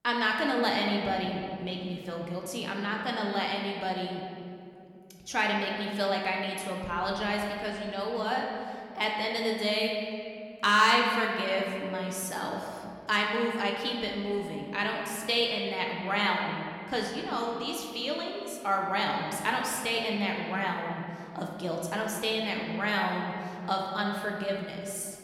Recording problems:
room echo; noticeable; dies away in 2.3 s
off-mic speech; somewhat distant

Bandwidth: 17.5 kHz